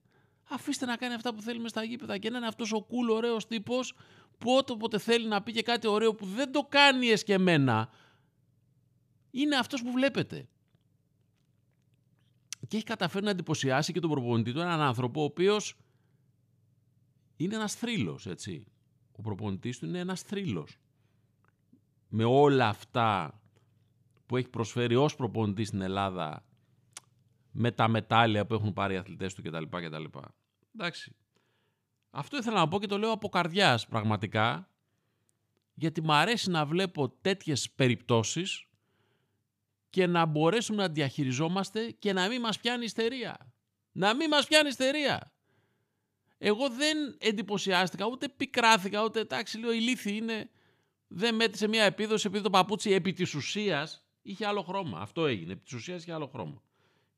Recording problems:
none

